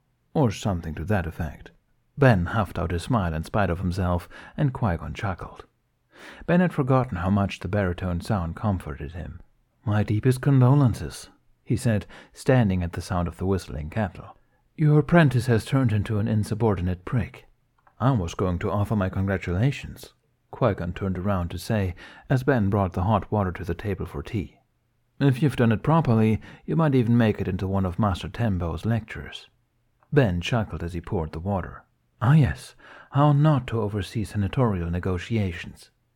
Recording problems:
muffled; slightly; fading above 3.5 kHz

